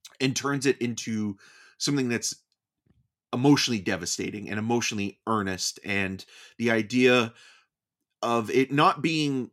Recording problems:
none

